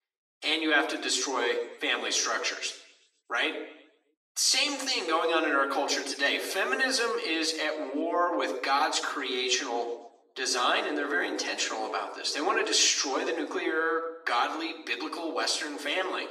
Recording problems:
thin; somewhat; fading below 300 Hz
room echo; slight; dies away in 0.7 s
off-mic speech; somewhat distant

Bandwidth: 14 kHz